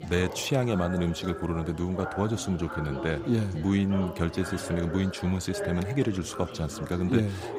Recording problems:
background chatter; loud; throughout; 4 voices, 10 dB below the speech

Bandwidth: 15.5 kHz